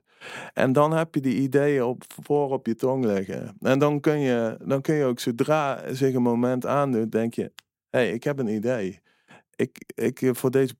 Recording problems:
none

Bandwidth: 16 kHz